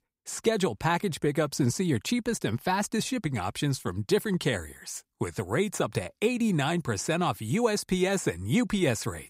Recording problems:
none

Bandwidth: 15.5 kHz